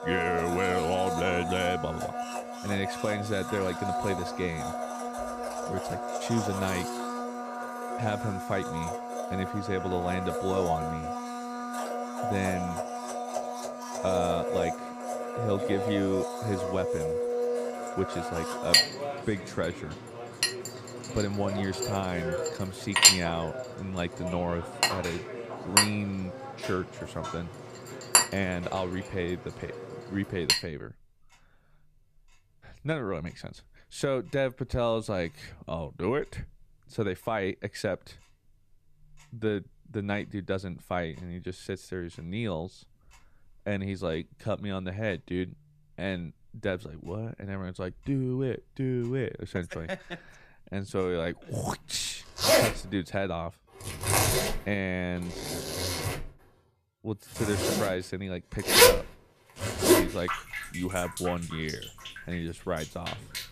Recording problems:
household noises; very loud; throughout; 4 dB above the speech

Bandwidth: 14.5 kHz